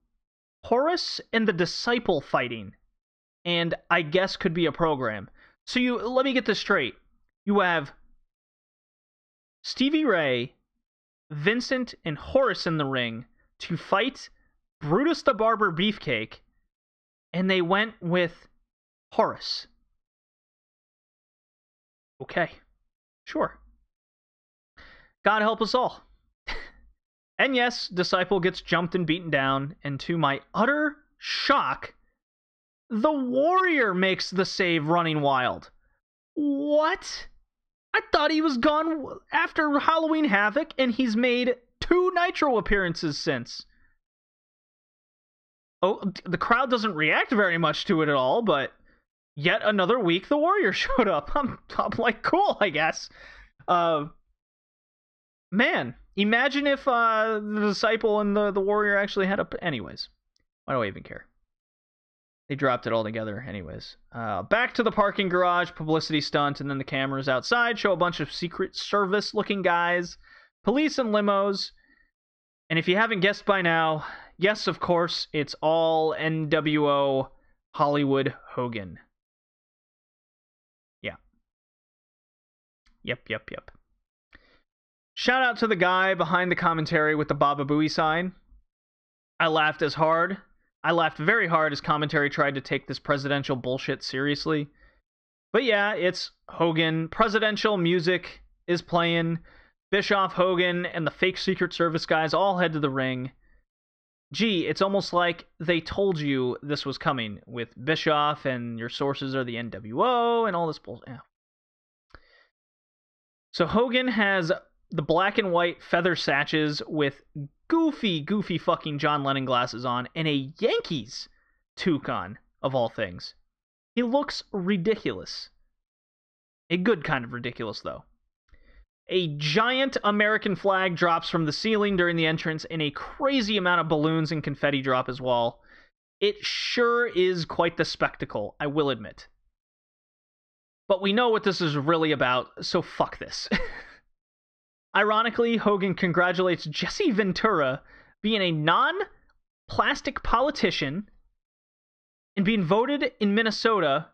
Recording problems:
muffled; slightly; fading above 4 kHz

